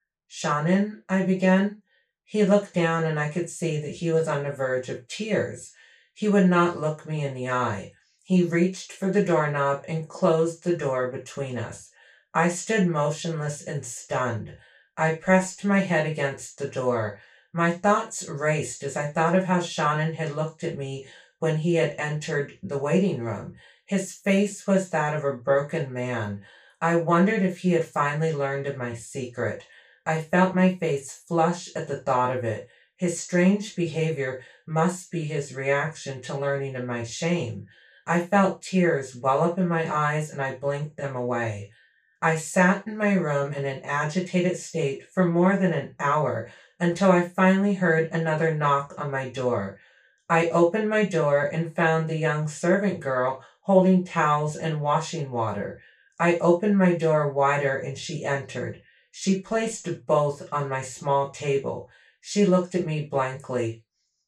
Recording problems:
off-mic speech; far
room echo; slight; dies away in 0.2 s

